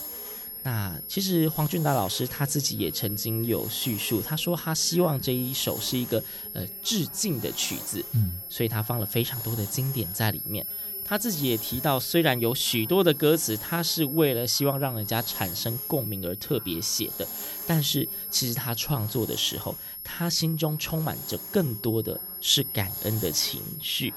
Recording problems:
high-pitched whine; loud; throughout; 11.5 kHz, 6 dB below the speech
hiss; noticeable; throughout; 15 dB below the speech
background chatter; faint; throughout; 3 voices, 25 dB below the speech

